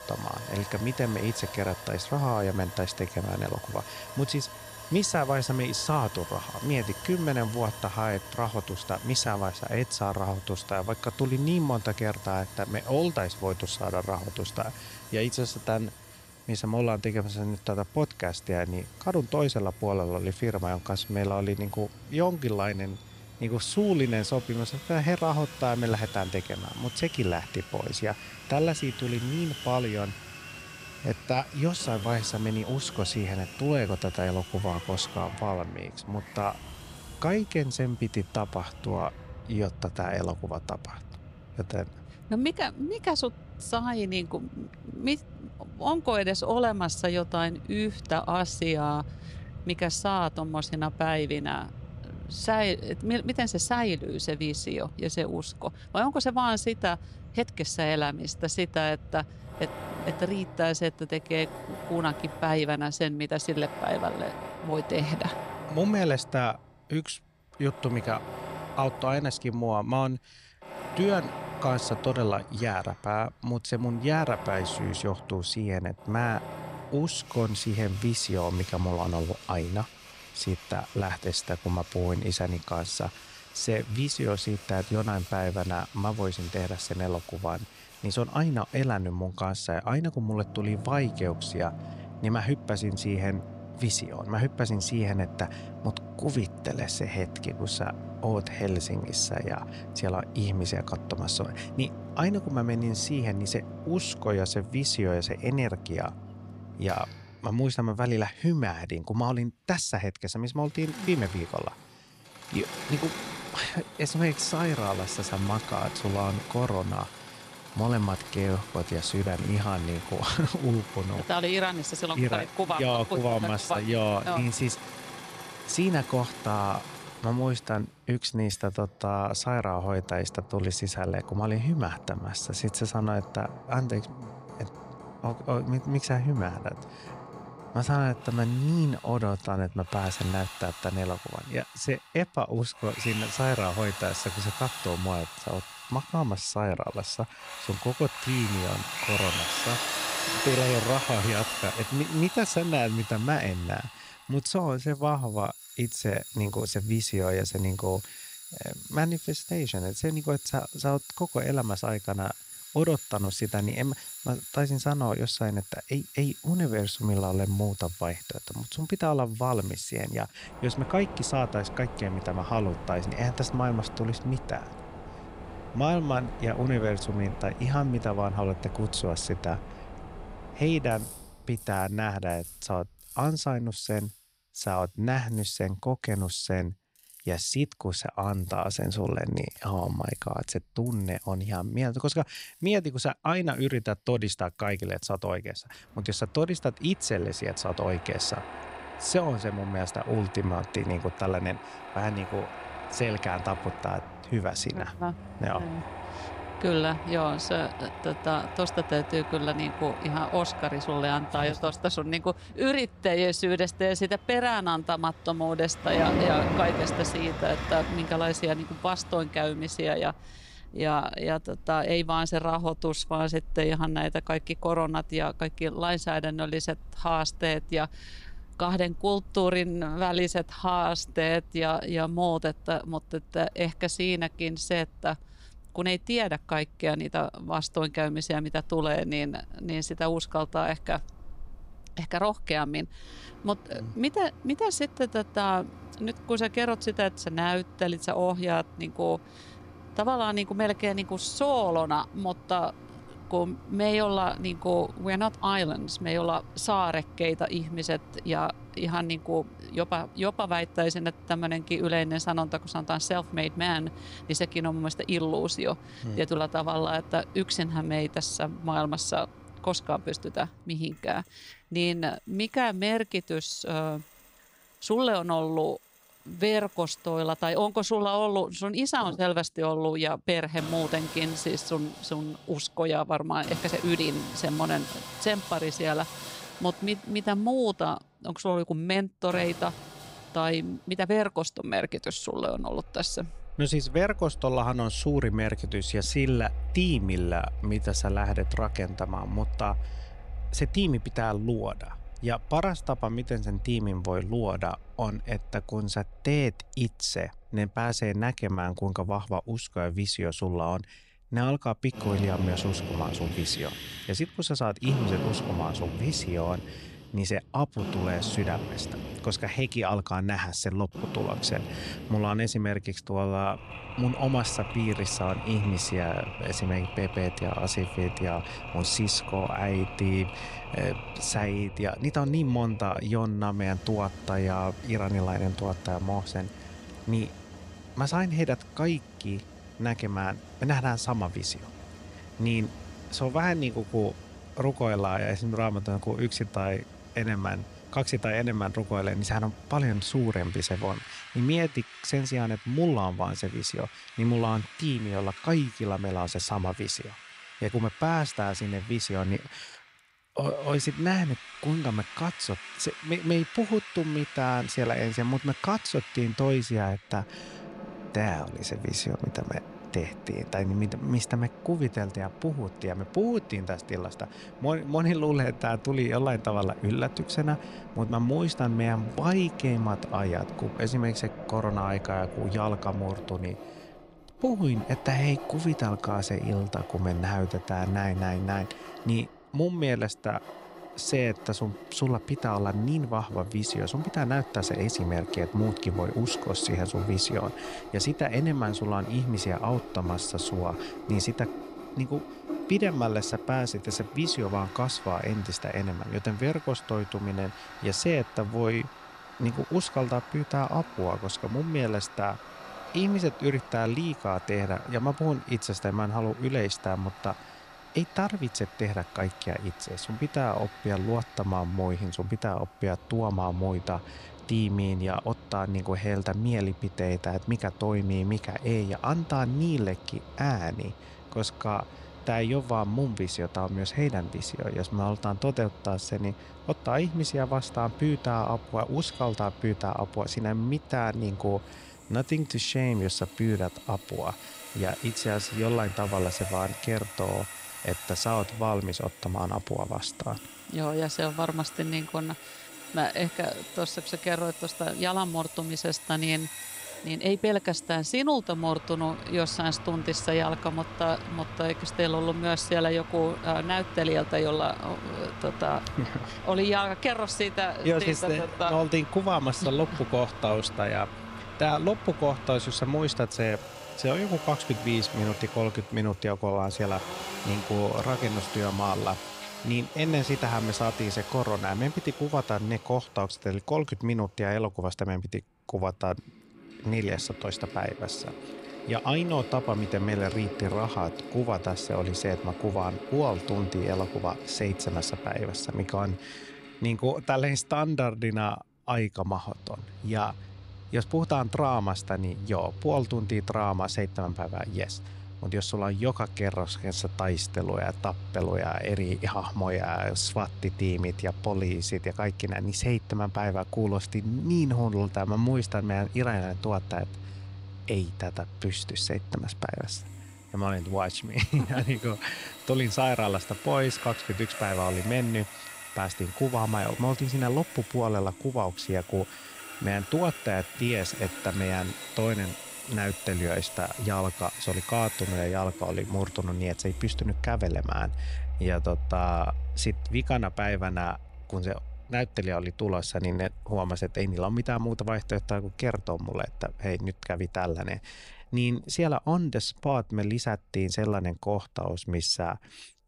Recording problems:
machinery noise; noticeable; throughout; 10 dB below the speech

